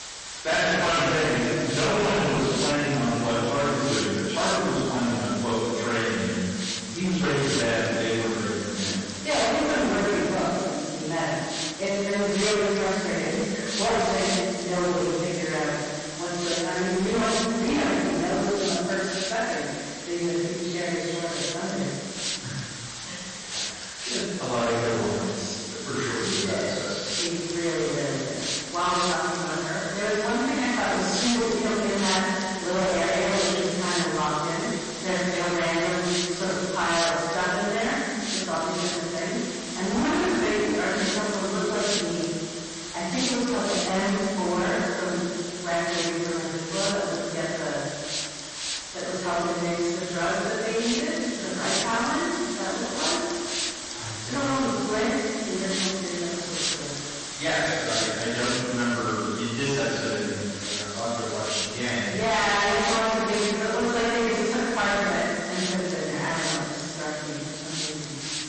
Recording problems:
distortion; heavy; 13% of the sound clipped
room echo; strong; dies away in 1.9 s
off-mic speech; far
garbled, watery; slightly; nothing above 8 kHz
hiss; loud; throughout; 6 dB below the speech

